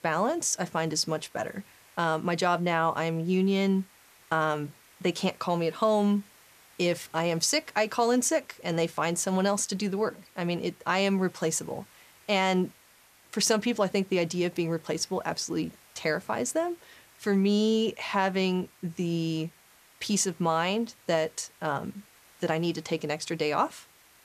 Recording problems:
hiss; faint; throughout; 25 dB below the speech

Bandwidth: 14.5 kHz